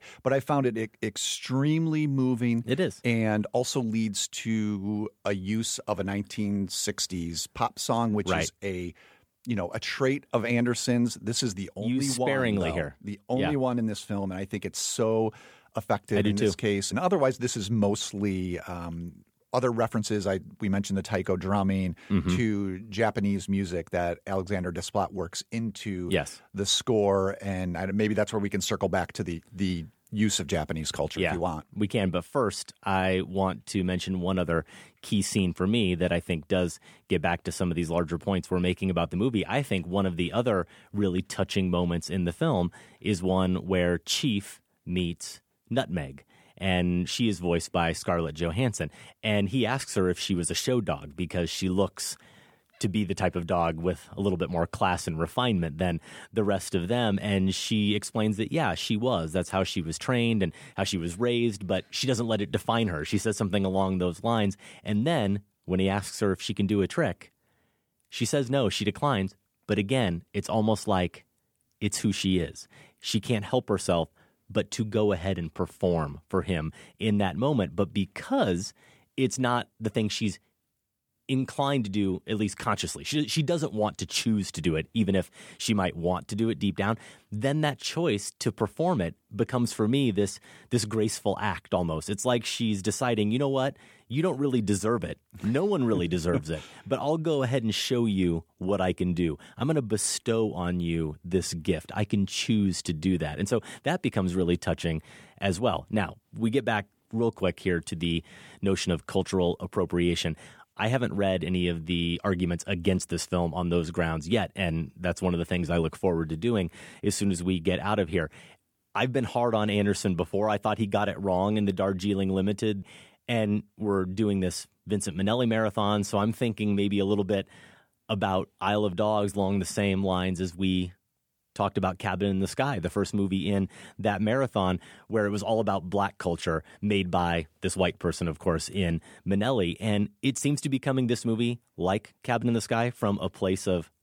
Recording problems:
none

